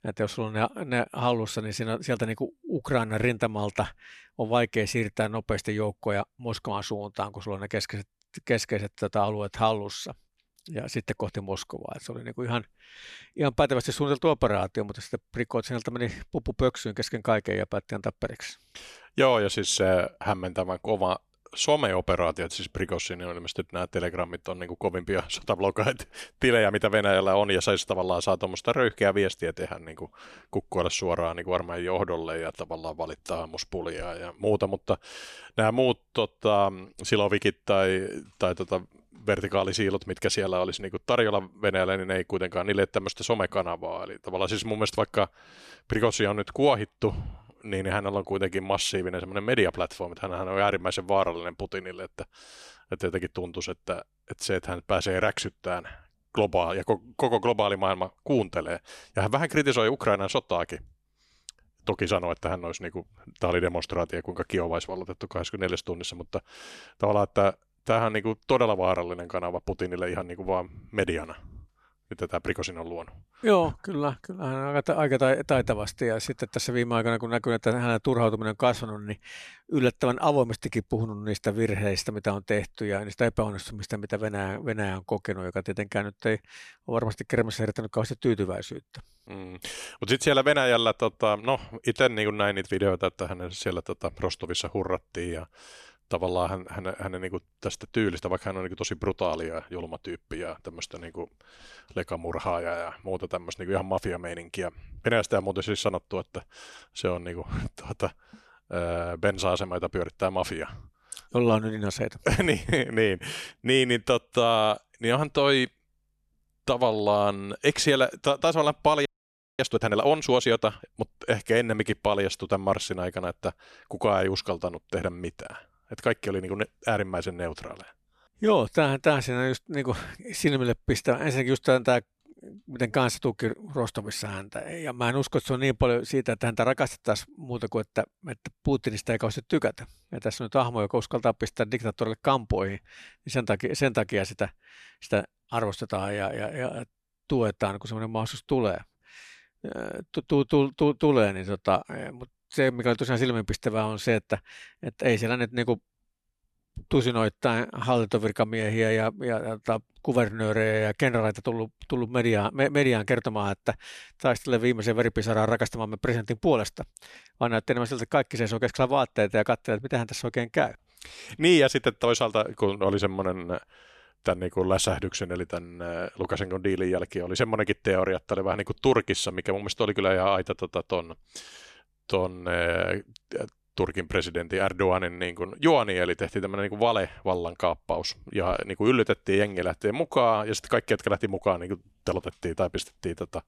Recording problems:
audio freezing; at 1:59 for 0.5 s

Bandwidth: 13.5 kHz